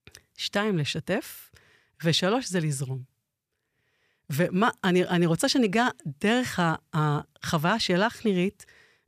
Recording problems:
none

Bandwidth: 14.5 kHz